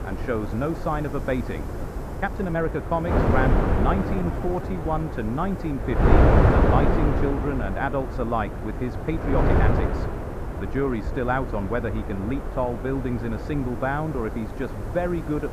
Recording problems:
muffled; slightly; fading above 3 kHz
wind noise on the microphone; heavy; 1 dB below the speech
hiss; faint; throughout; 30 dB below the speech
uneven, jittery; strongly; from 2 to 11 s

